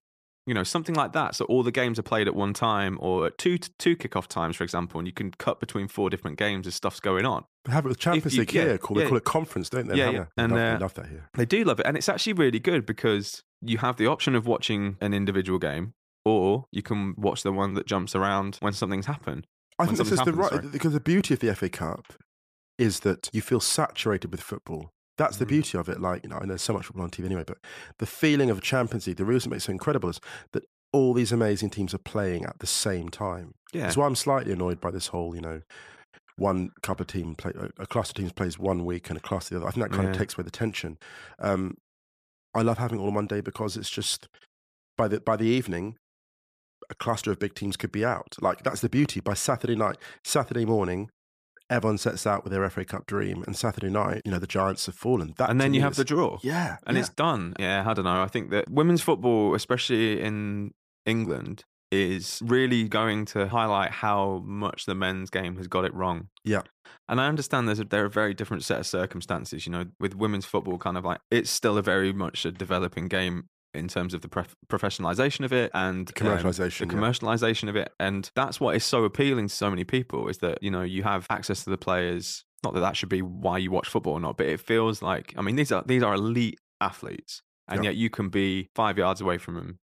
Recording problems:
none

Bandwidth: 14.5 kHz